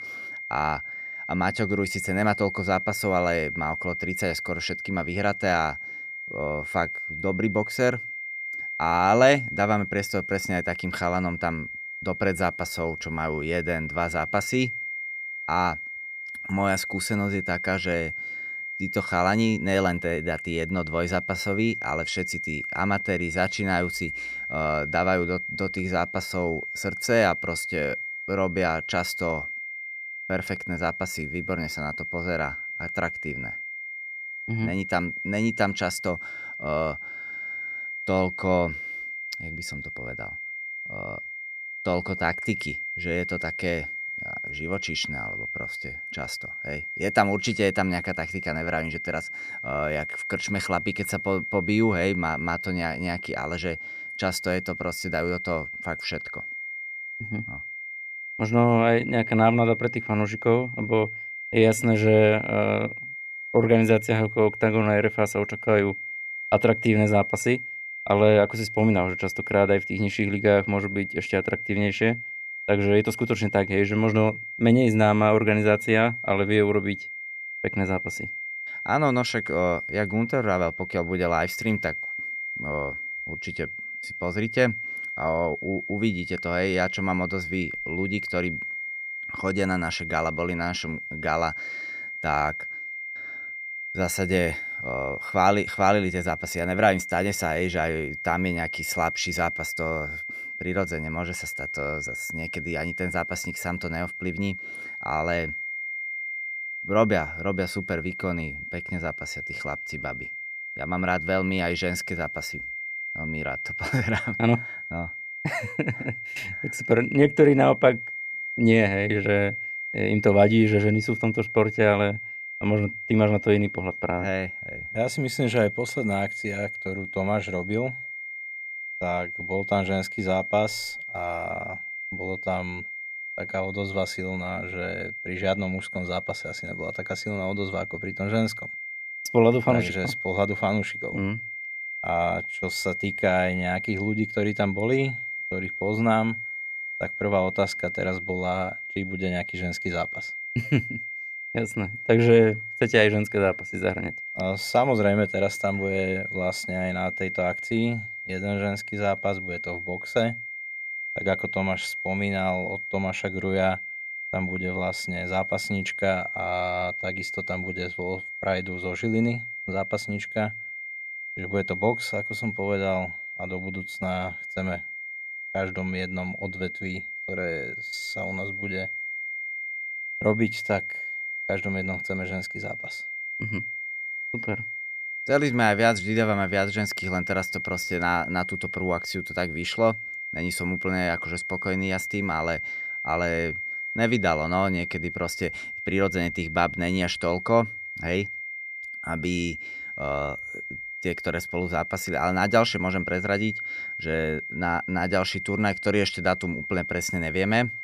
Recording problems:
high-pitched whine; loud; throughout; 2 kHz, 6 dB below the speech

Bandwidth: 14.5 kHz